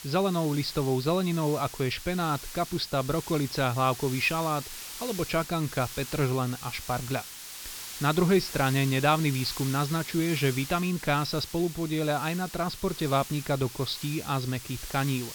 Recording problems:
high frequencies cut off; noticeable; nothing above 5.5 kHz
hiss; noticeable; throughout; 10 dB below the speech

